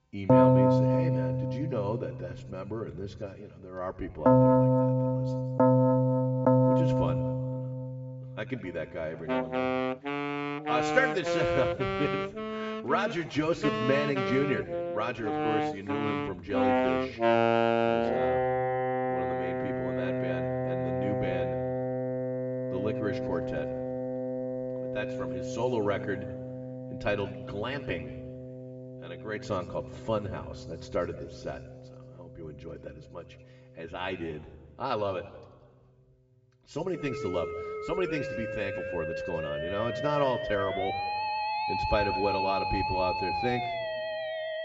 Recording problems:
high frequencies cut off; noticeable; nothing above 8 kHz
room echo; slight; dies away in 1.1 s
off-mic speech; somewhat distant
background music; very loud; throughout; 5 dB above the speech

